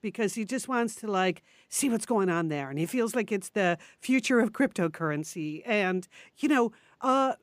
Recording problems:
none

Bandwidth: 15 kHz